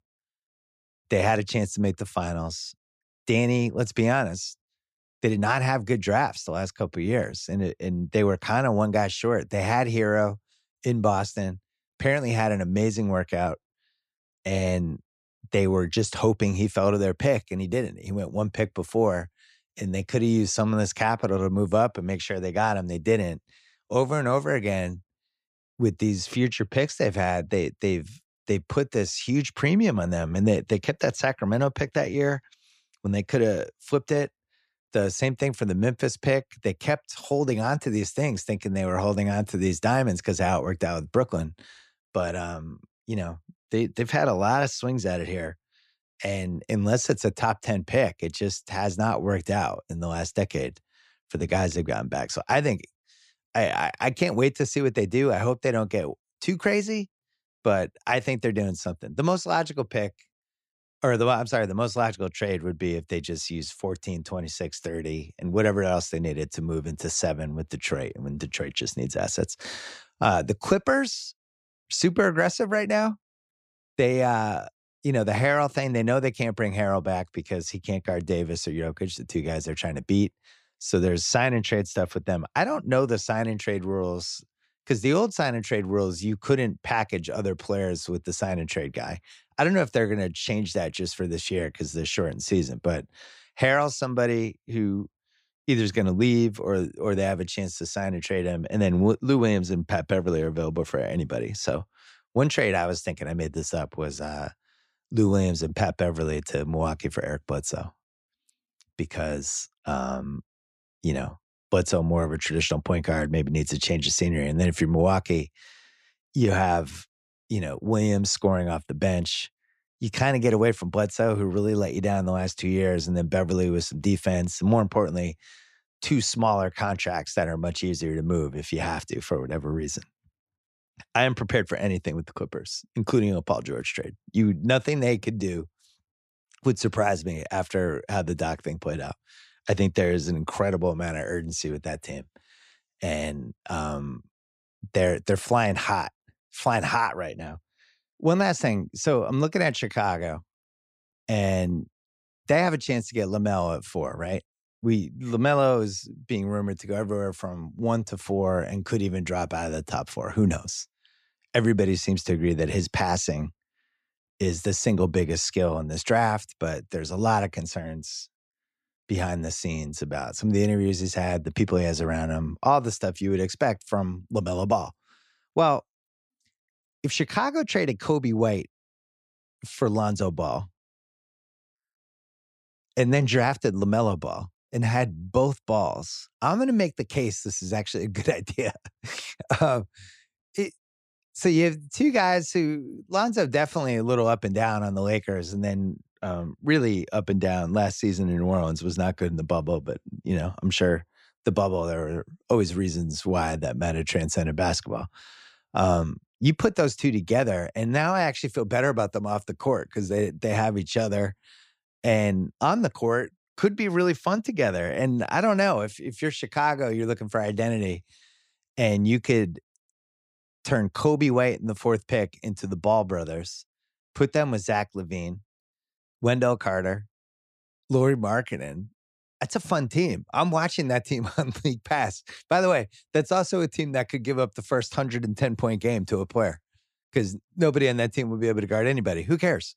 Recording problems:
none

